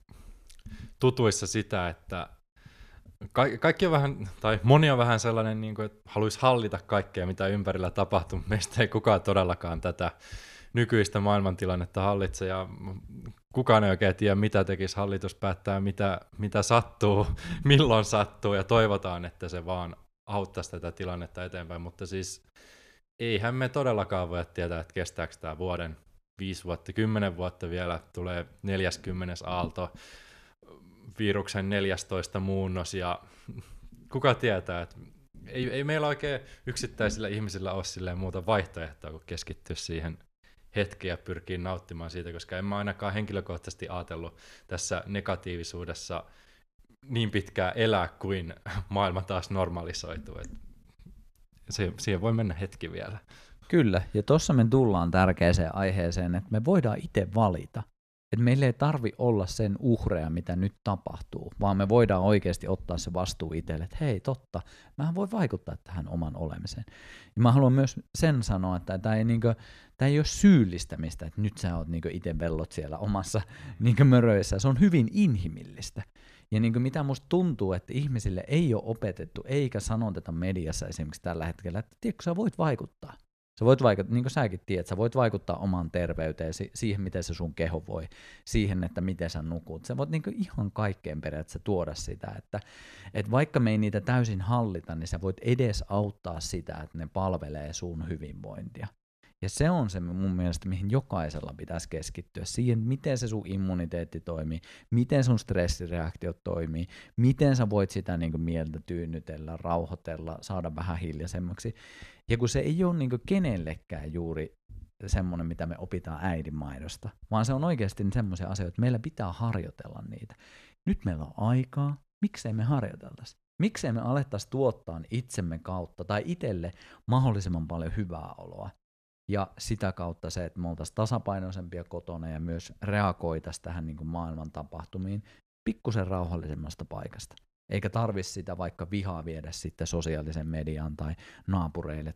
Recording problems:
none

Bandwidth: 14.5 kHz